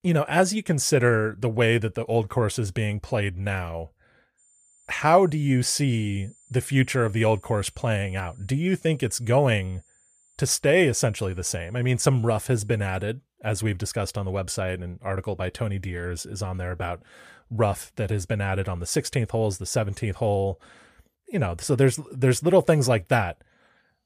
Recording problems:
high-pitched whine; faint; from 4.5 to 13 s; 7 kHz, 30 dB below the speech

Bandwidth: 14.5 kHz